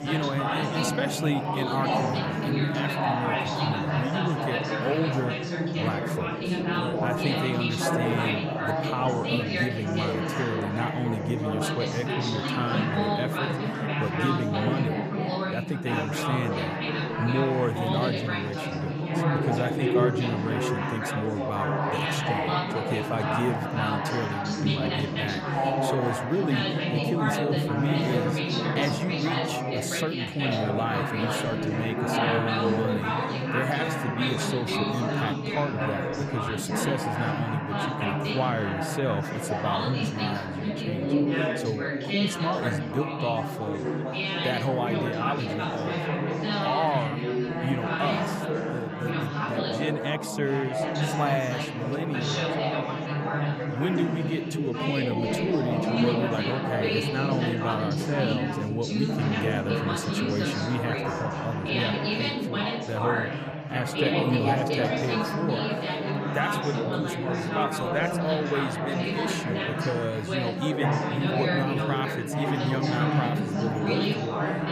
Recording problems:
chatter from many people; very loud; throughout; 4 dB above the speech

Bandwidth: 15 kHz